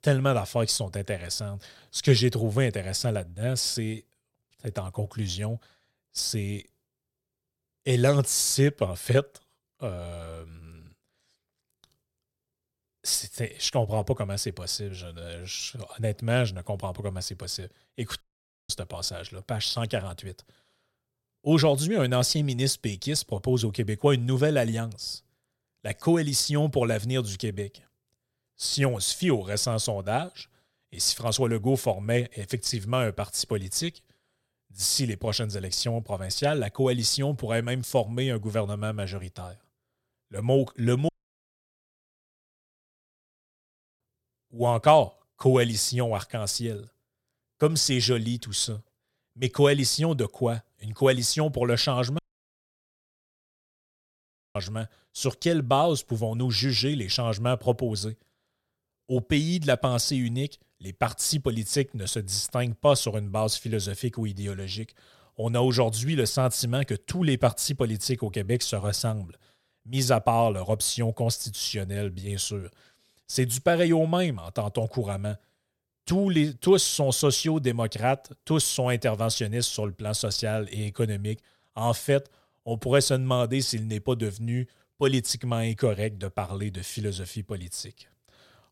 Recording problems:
audio cutting out; at 18 s, at 41 s for 3 s and at 52 s for 2.5 s

